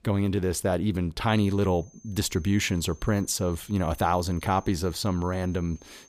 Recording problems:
high-pitched whine; faint; from 1.5 s on; 6.5 kHz, 25 dB below the speech

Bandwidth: 15 kHz